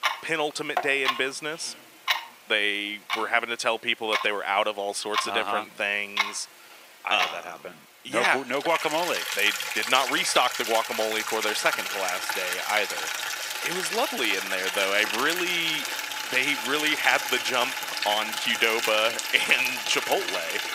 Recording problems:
thin; very; fading below 550 Hz
household noises; loud; throughout; 3 dB below the speech

